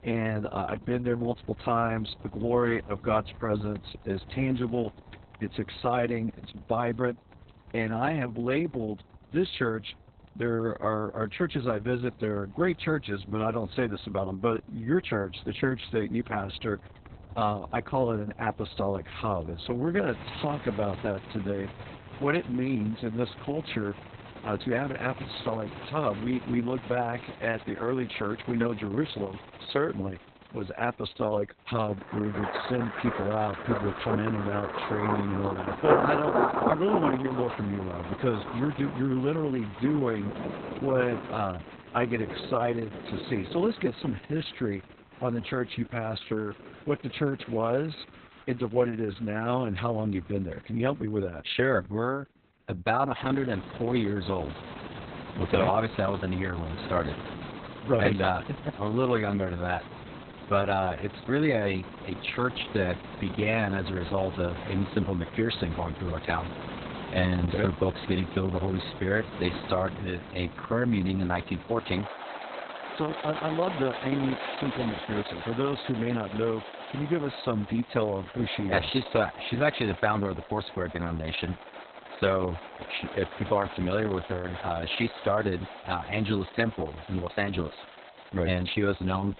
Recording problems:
garbled, watery; badly; nothing above 4 kHz
rain or running water; loud; throughout; 9 dB below the speech

